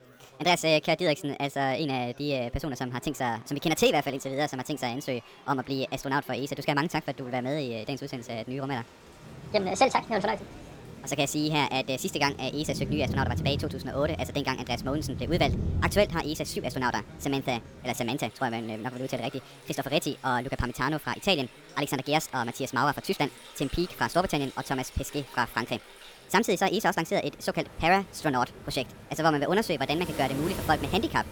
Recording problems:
wrong speed and pitch; too fast and too high; 1.5 times normal speed
rain or running water; noticeable; from 7 s on; 10 dB below the speech
chatter from many people; faint; throughout; 25 dB below the speech

